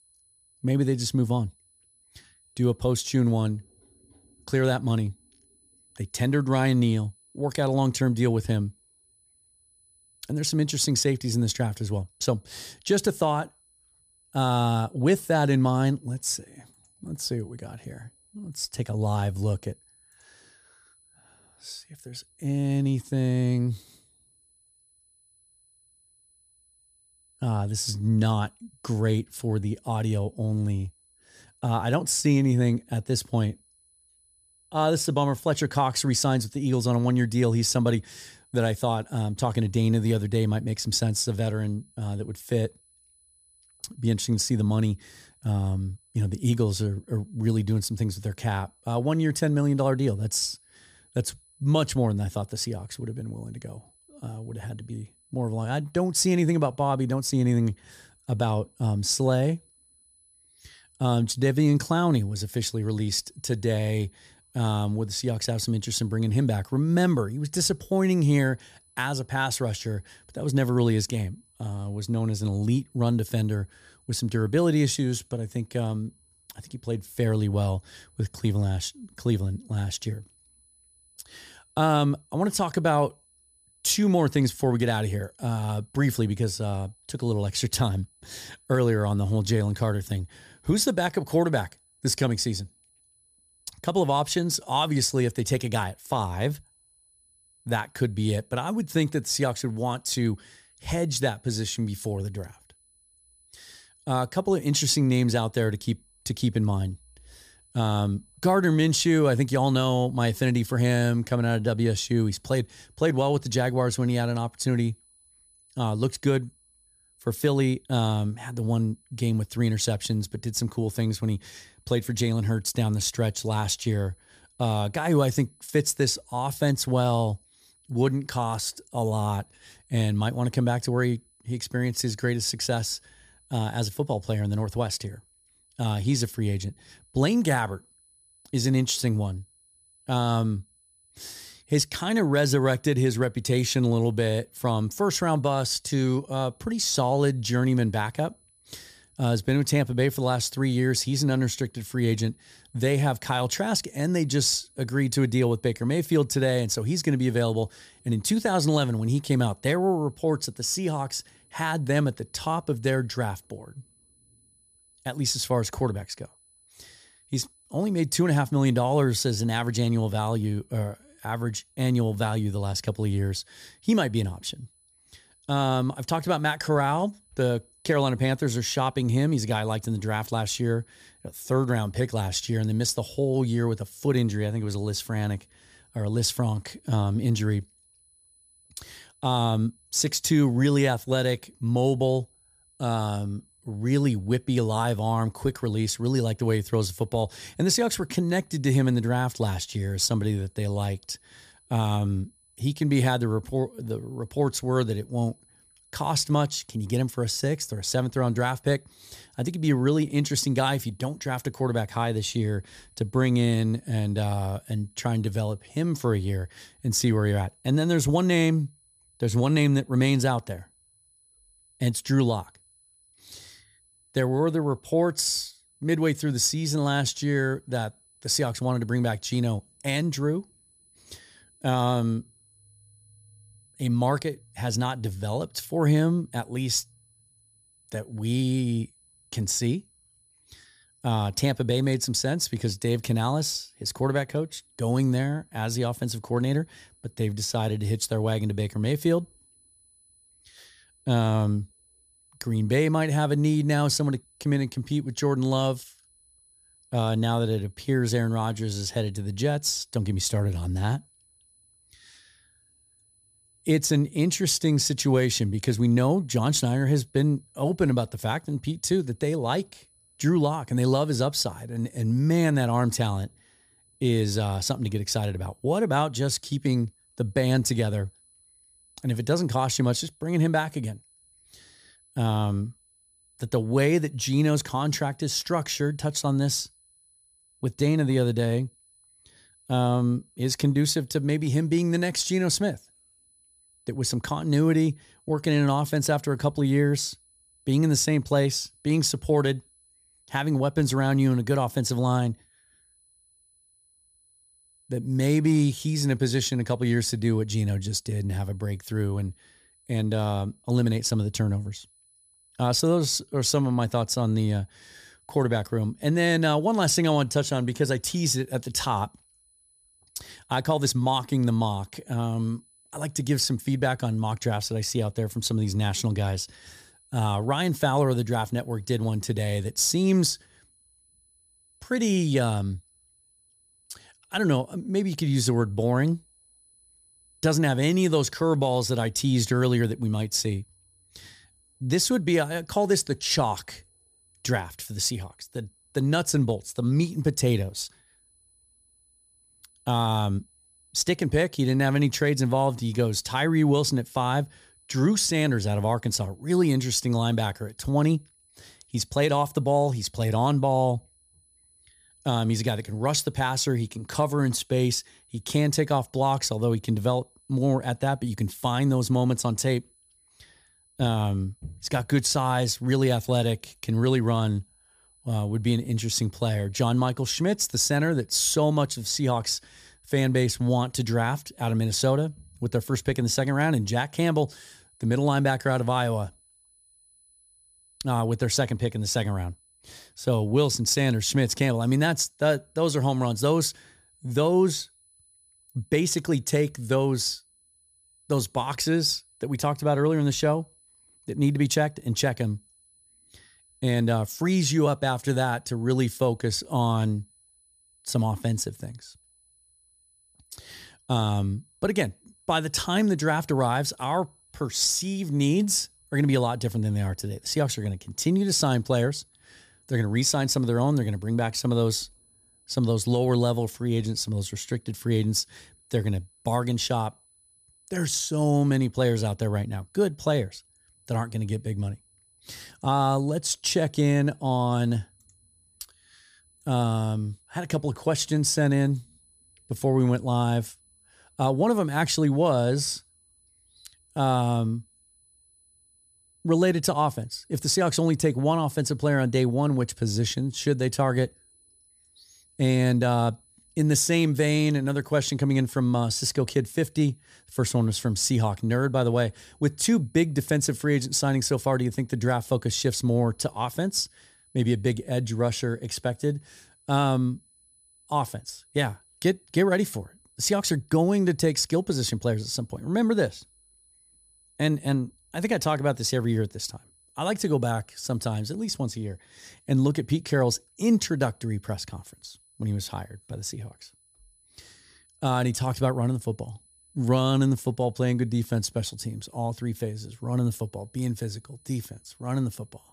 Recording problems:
high-pitched whine; faint; throughout; 10 kHz, 35 dB below the speech

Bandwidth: 14.5 kHz